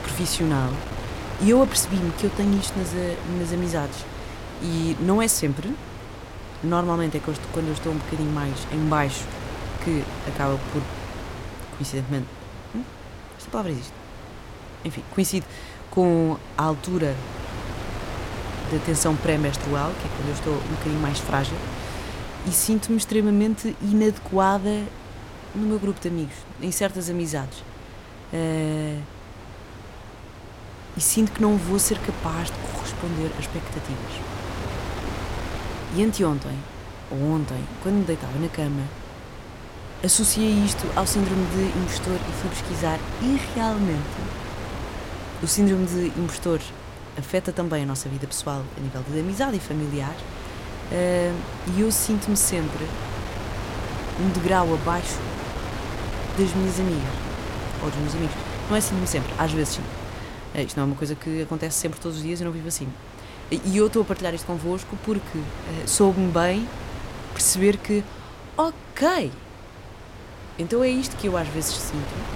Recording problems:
wind noise on the microphone; heavy; 9 dB below the speech

